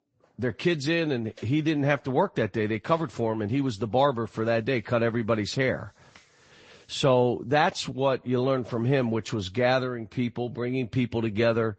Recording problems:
high frequencies cut off; noticeable; nothing above 8 kHz
garbled, watery; slightly

